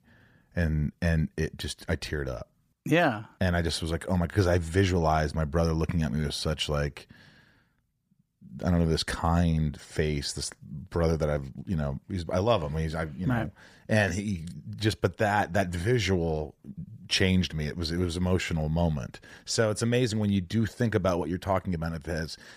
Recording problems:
none

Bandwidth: 15 kHz